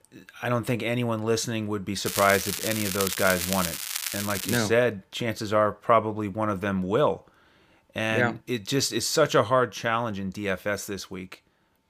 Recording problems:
crackling; loud; from 2 to 4.5 s; 4 dB below the speech

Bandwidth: 15 kHz